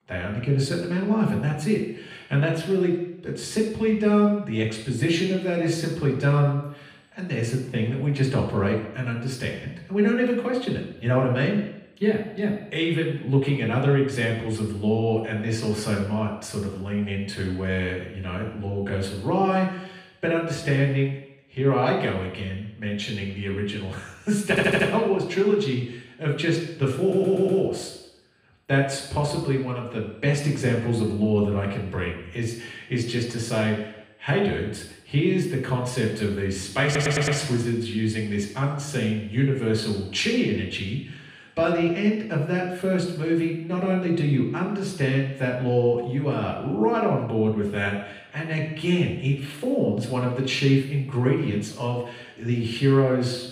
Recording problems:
off-mic speech; far
room echo; noticeable; dies away in 0.8 s
audio stuttering; at 24 s, at 27 s and at 37 s

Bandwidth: 15.5 kHz